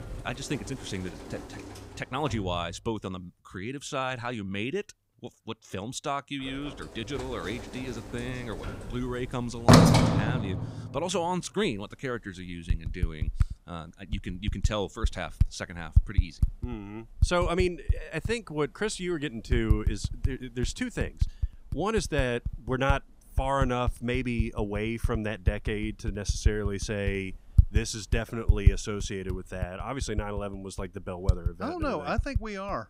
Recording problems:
household noises; very loud; throughout; 3 dB above the speech

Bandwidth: 15.5 kHz